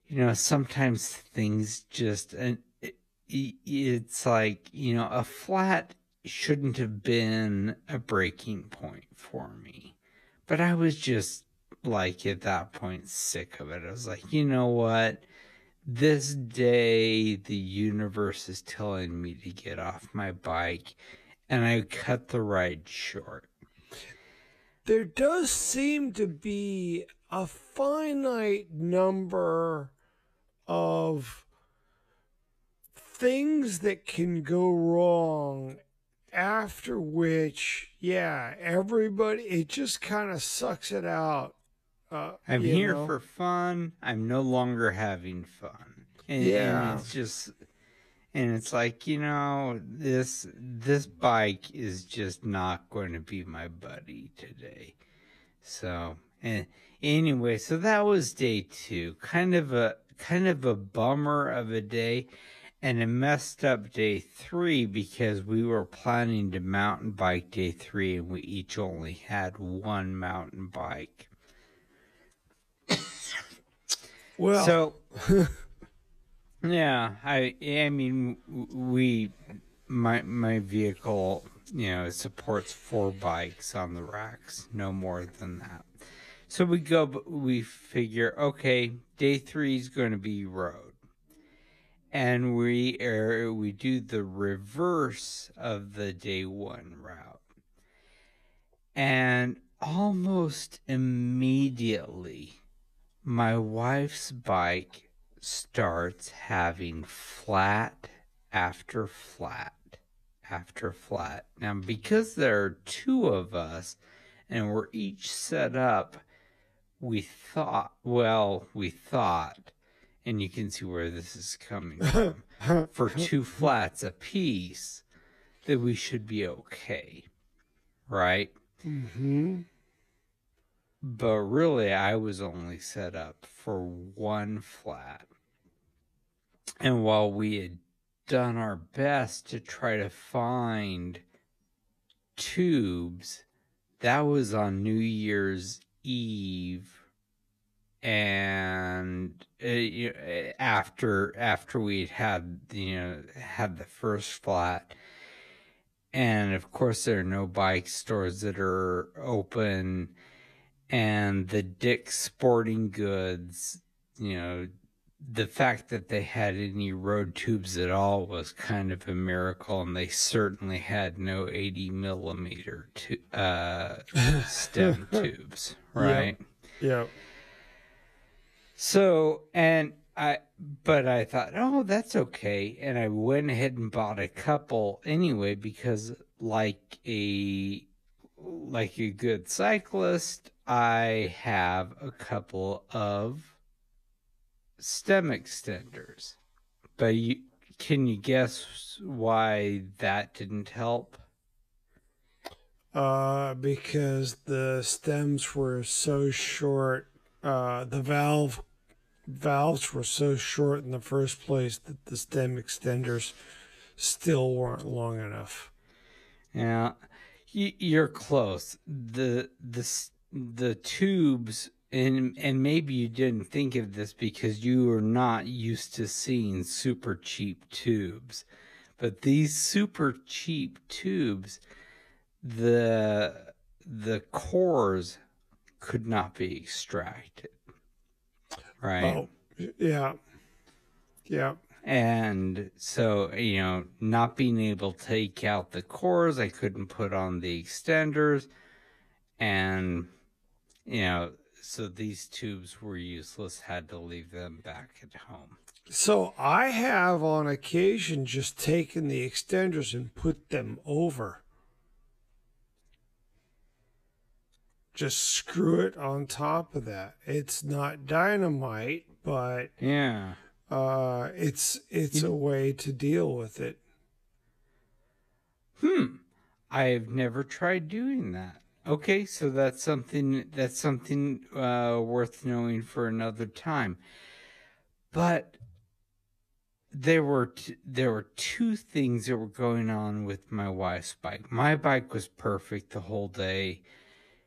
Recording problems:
wrong speed, natural pitch; too slow; 0.6 times normal speed

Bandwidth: 14.5 kHz